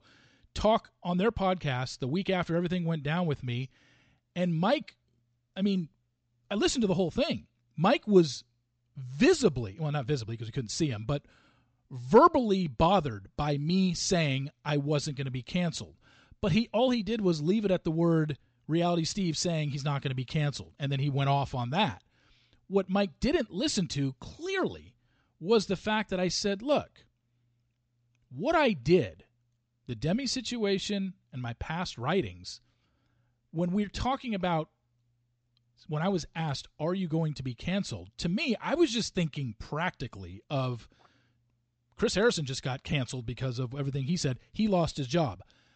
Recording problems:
high frequencies cut off; noticeable; nothing above 8 kHz

